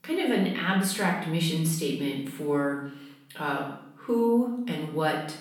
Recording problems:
off-mic speech; far
room echo; noticeable; dies away in 0.6 s

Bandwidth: 18.5 kHz